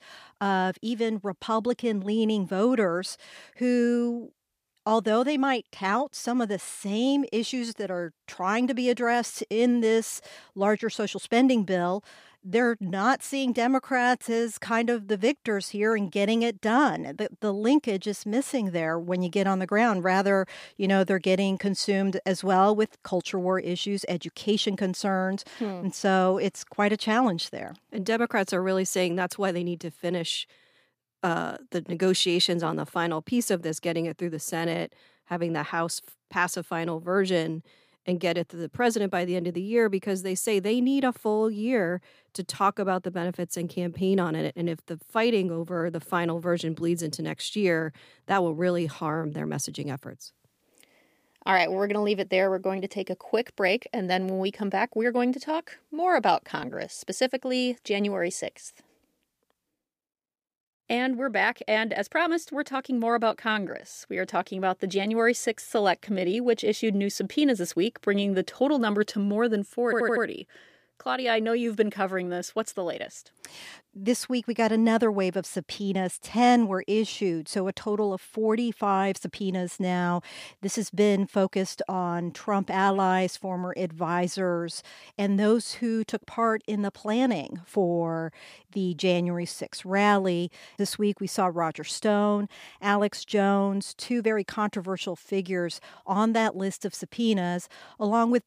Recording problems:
audio stuttering; at 1:10

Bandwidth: 15 kHz